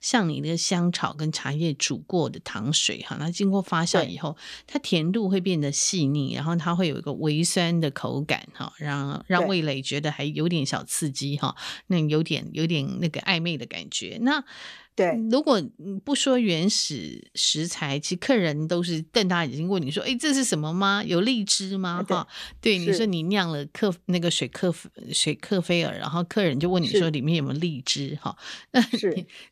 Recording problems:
none

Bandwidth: 14.5 kHz